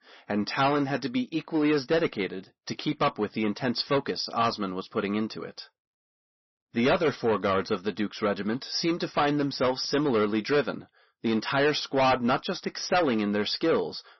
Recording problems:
distortion; heavy; 8% of the sound clipped
garbled, watery; slightly; nothing above 6 kHz

